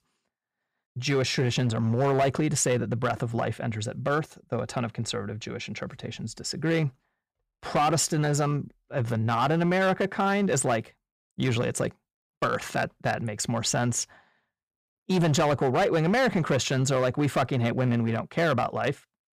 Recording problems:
distortion; slight; 6% of the sound clipped

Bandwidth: 14.5 kHz